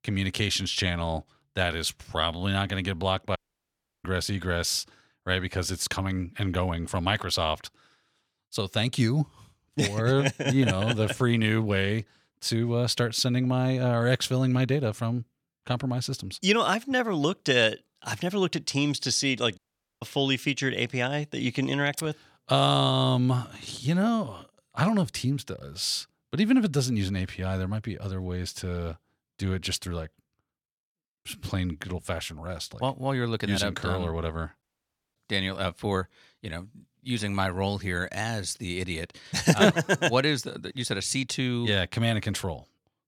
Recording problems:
audio cutting out; at 3.5 s for 0.5 s, at 20 s and at 35 s for 0.5 s

